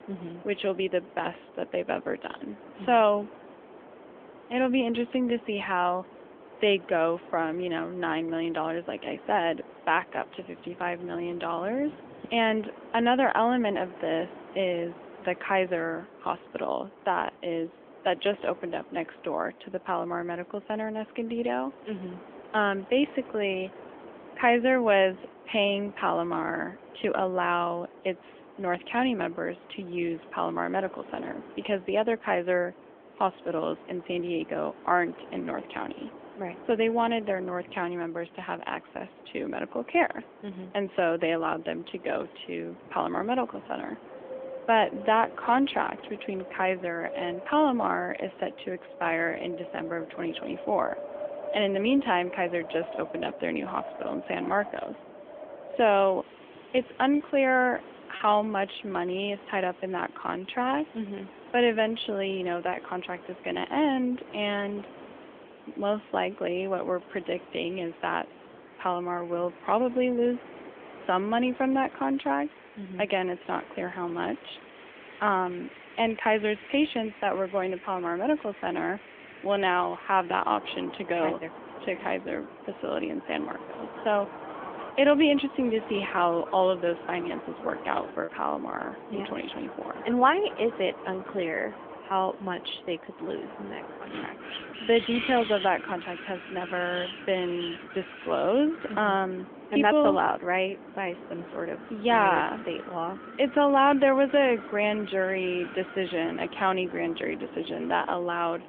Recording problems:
phone-call audio; nothing above 3.5 kHz
wind in the background; noticeable; throughout; 15 dB below the speech
choppy; occasionally; from 57 to 58 s and at 1:28; 3% of the speech affected

